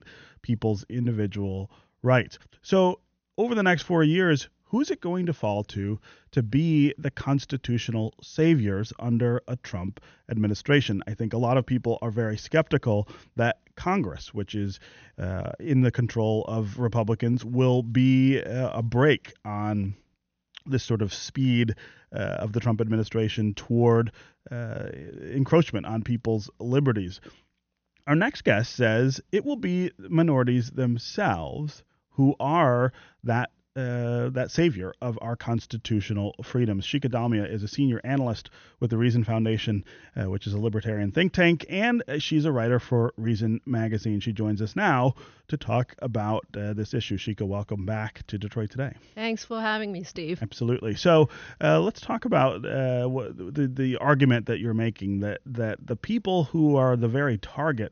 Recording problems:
high frequencies cut off; noticeable; nothing above 6.5 kHz

